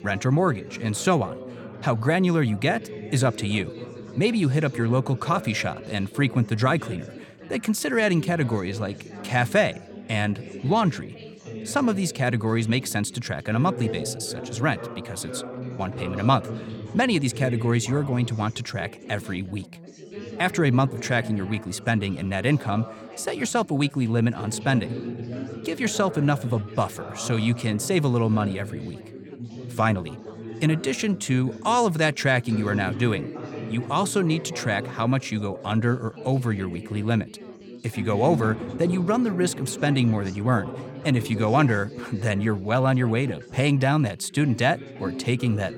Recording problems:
chatter from many people; noticeable; throughout; 15 dB below the speech

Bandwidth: 17.5 kHz